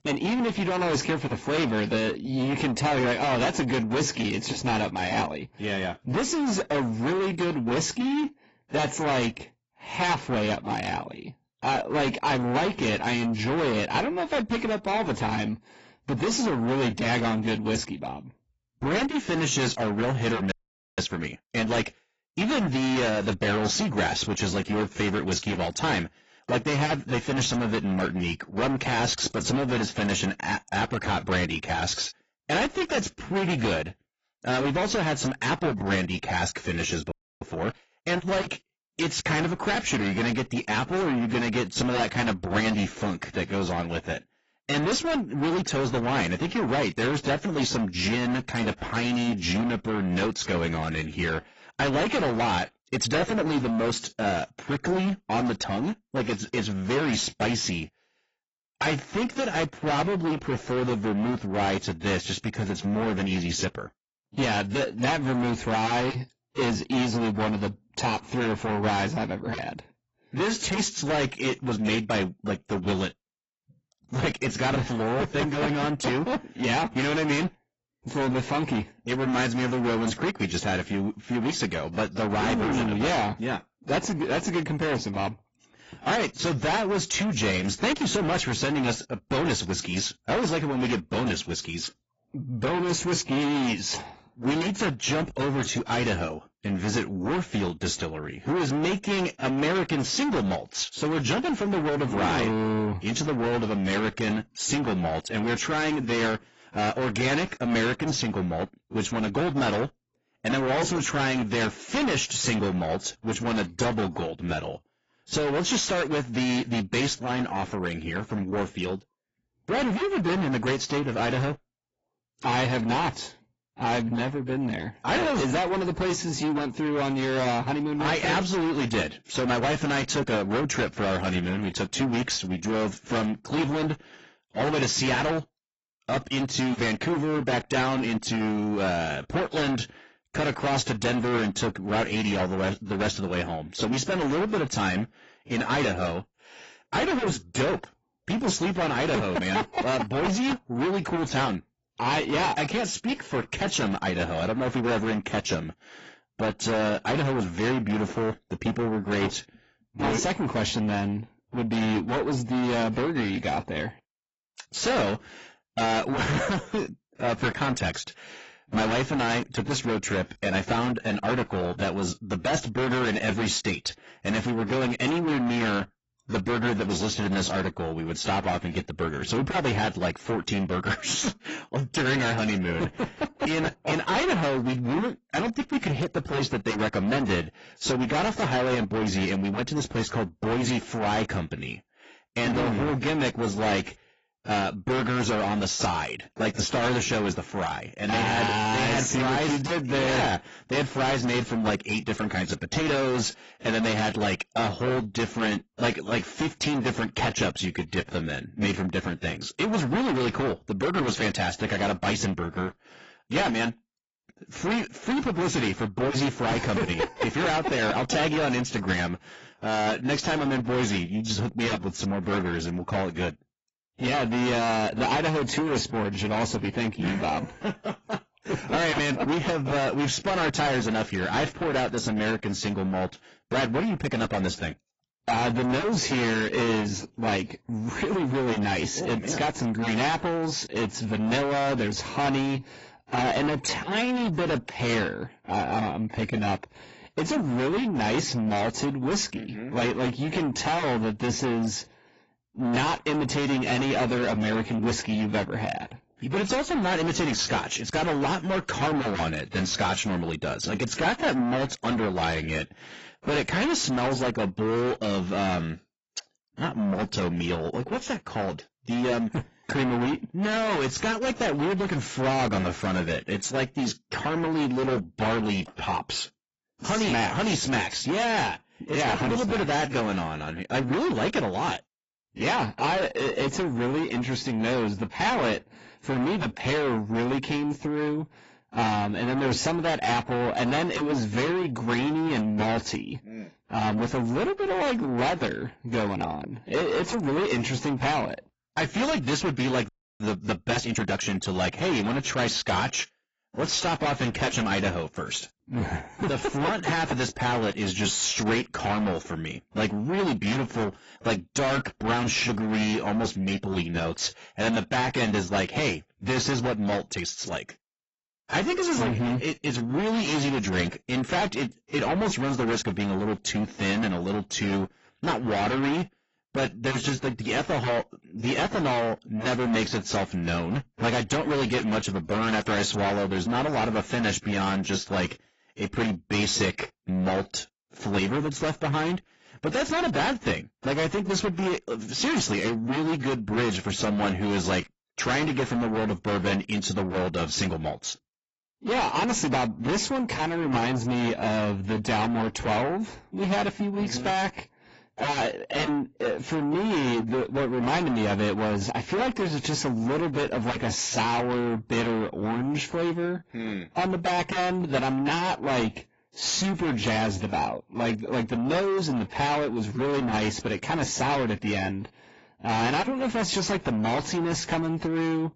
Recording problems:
distortion; heavy; 7 dB below the speech
garbled, watery; badly; nothing above 7.5 kHz
audio freezing; at 21 s, at 37 s and at 5:00

